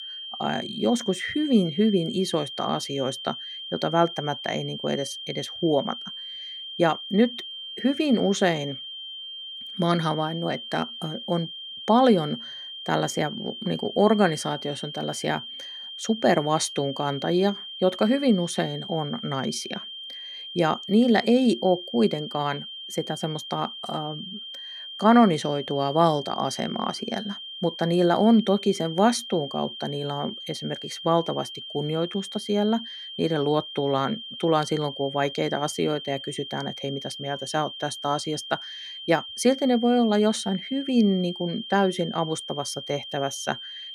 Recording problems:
high-pitched whine; loud; throughout; 3 kHz, 10 dB below the speech

